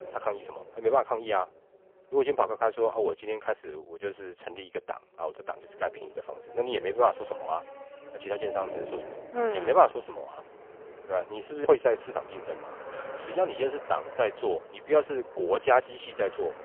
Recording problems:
phone-call audio; poor line; nothing above 3.5 kHz
traffic noise; noticeable; throughout; 15 dB below the speech

